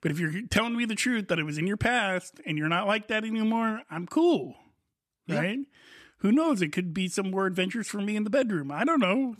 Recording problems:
none

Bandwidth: 14 kHz